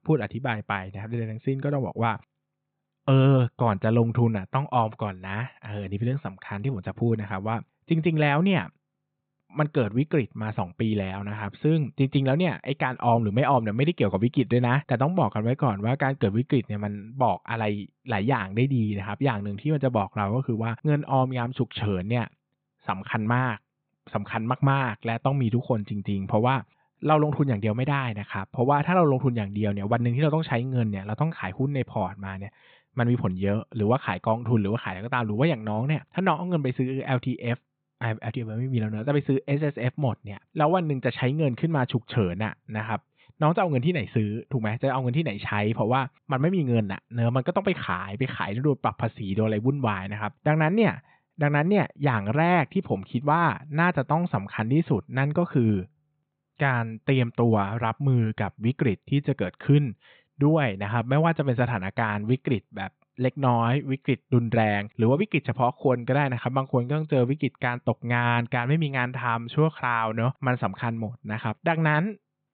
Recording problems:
high frequencies cut off; severe; nothing above 4 kHz

